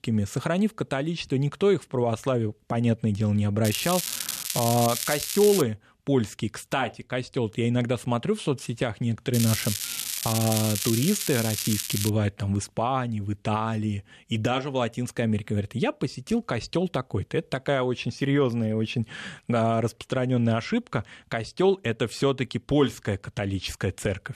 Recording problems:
crackling; loud; from 3.5 to 5.5 s and from 9.5 to 12 s; 2 dB below the speech

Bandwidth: 13.5 kHz